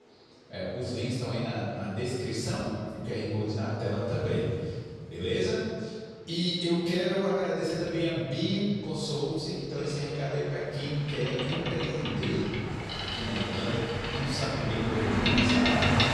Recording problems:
room echo; strong; dies away in 1.8 s
off-mic speech; far
train or aircraft noise; very loud; throughout; 2 dB above the speech

